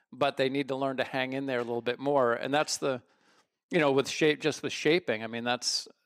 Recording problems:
none

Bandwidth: 15 kHz